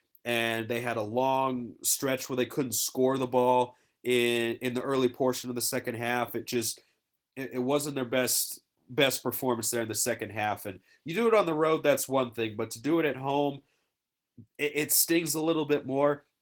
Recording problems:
garbled, watery; slightly; nothing above 17.5 kHz

